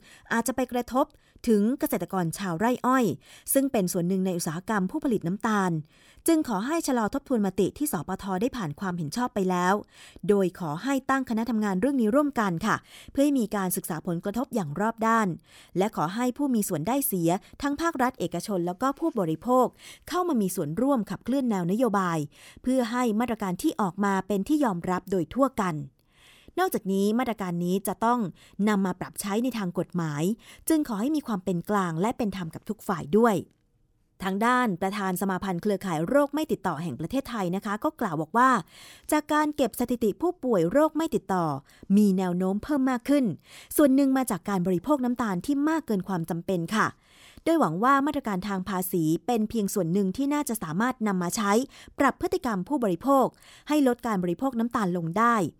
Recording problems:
none

